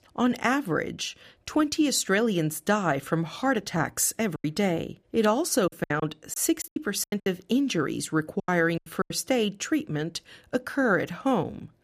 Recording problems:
choppy; very; from 4.5 to 7.5 s and at 8.5 s; 17% of the speech affected

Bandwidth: 15 kHz